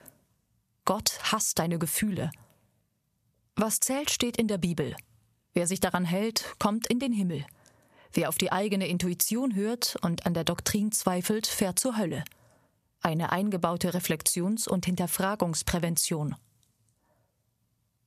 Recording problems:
squashed, flat; somewhat

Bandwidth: 14.5 kHz